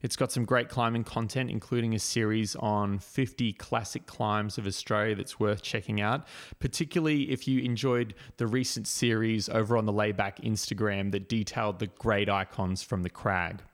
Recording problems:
none

